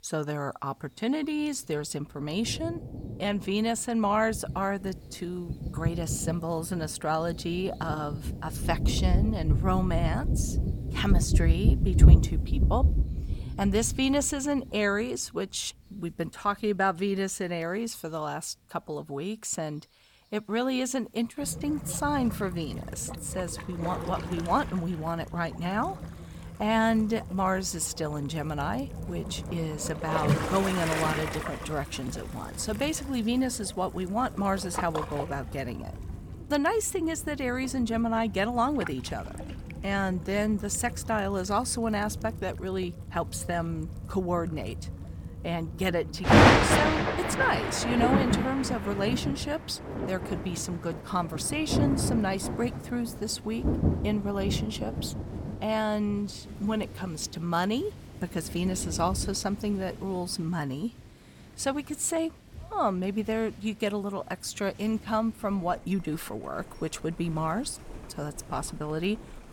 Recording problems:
rain or running water; loud; throughout; as loud as the speech

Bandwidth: 17.5 kHz